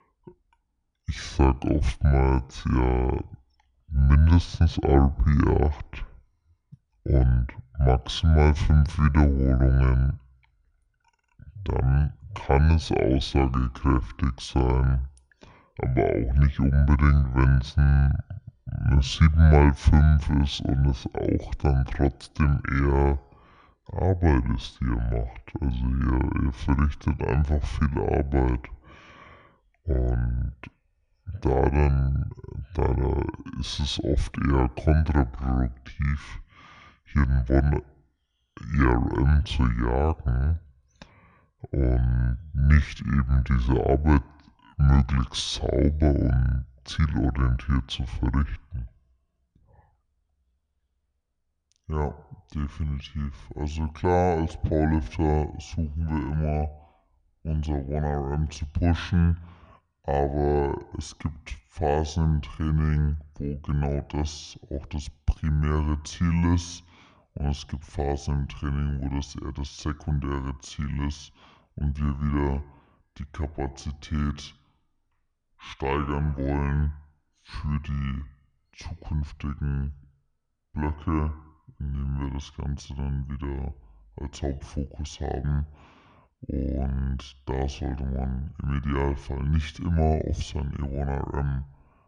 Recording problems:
wrong speed and pitch; too slow and too low; 0.6 times normal speed

